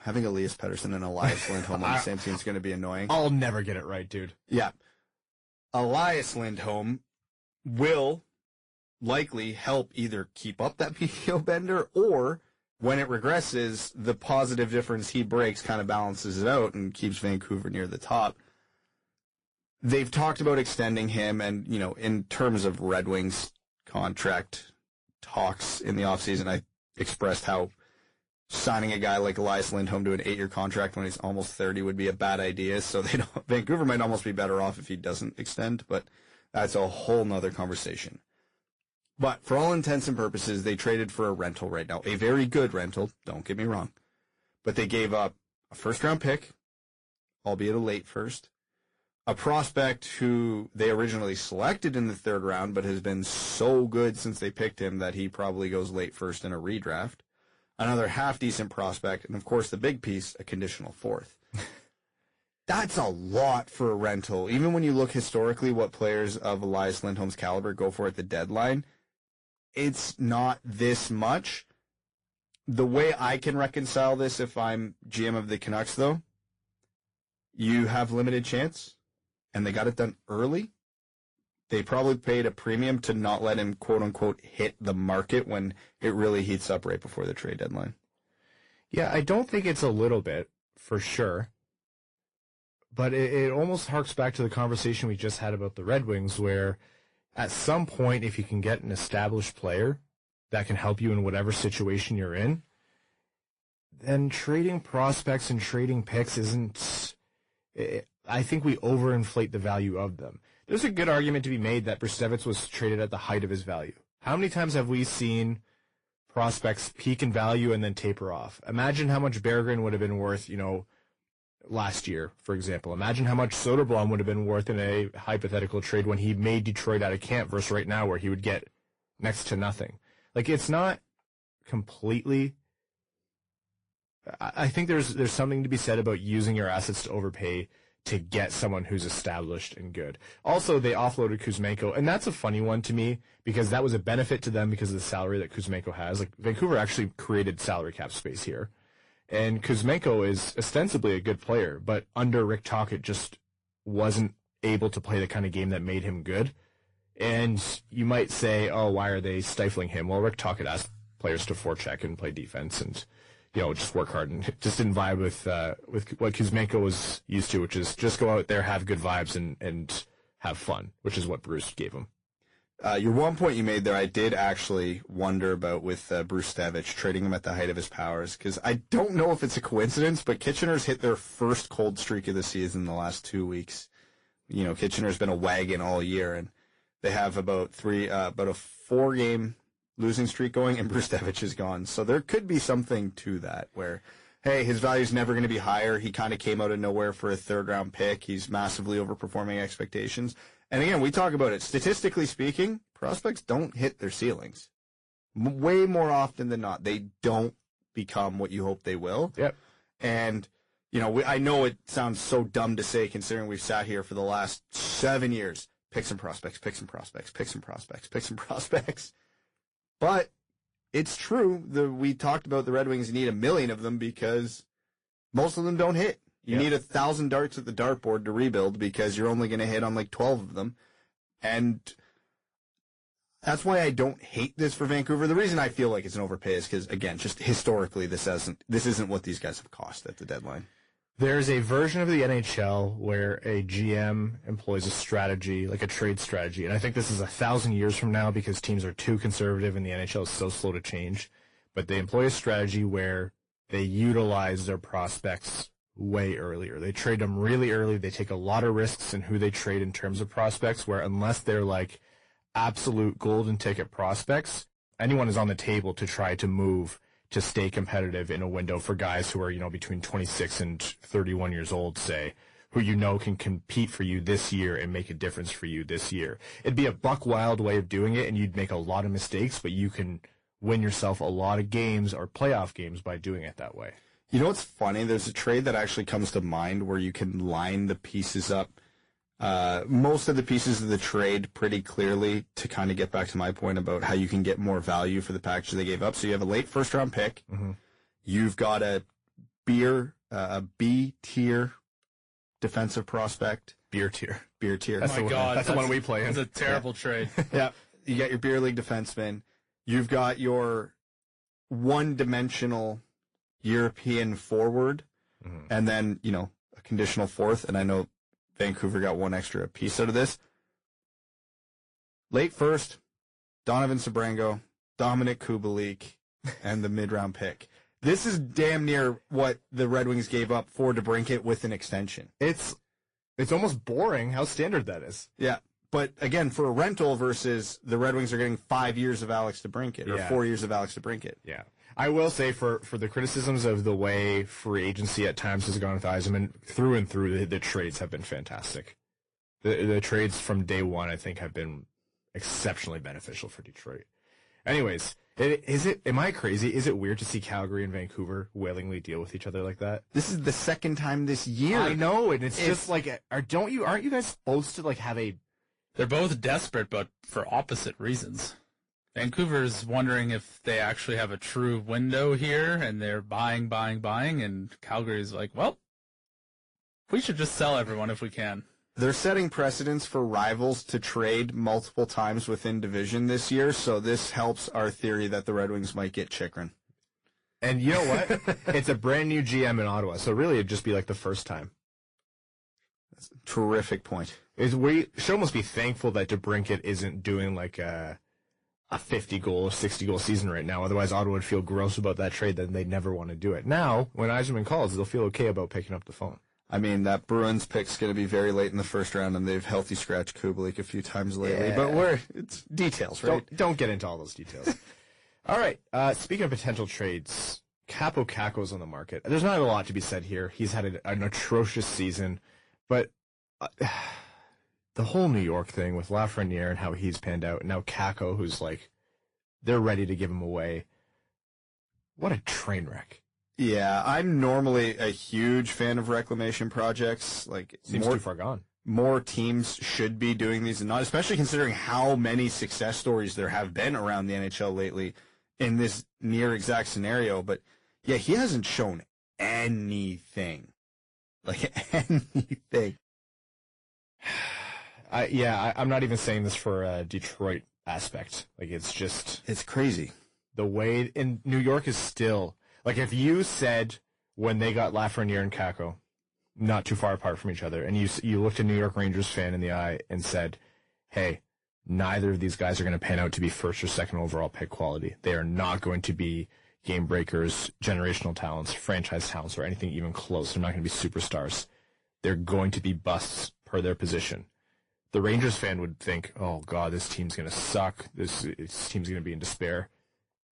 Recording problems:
distortion; slight; 10 dB below the speech
garbled, watery; slightly; nothing above 10.5 kHz

